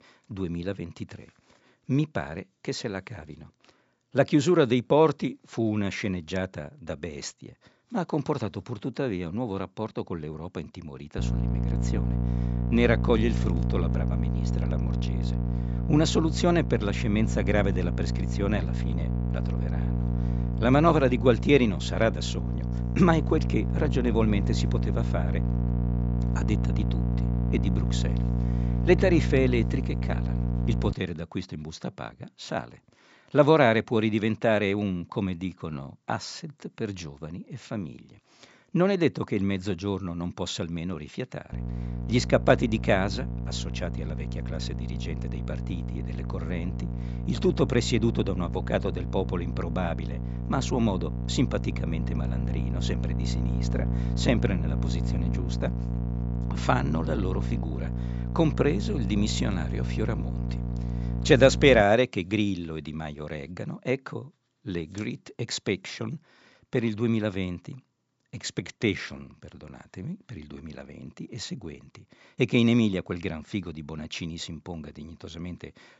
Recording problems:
high frequencies cut off; noticeable; nothing above 8 kHz
electrical hum; noticeable; from 11 to 31 s and from 42 s to 1:02; 60 Hz, 10 dB below the speech

